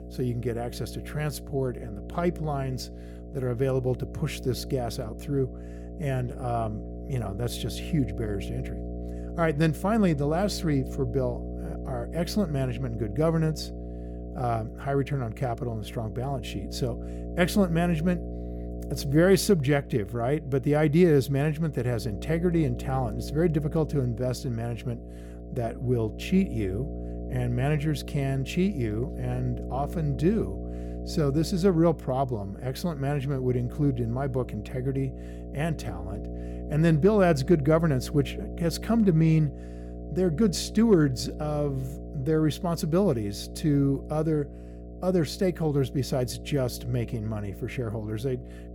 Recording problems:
electrical hum; noticeable; throughout; 60 Hz, 15 dB below the speech

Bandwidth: 17.5 kHz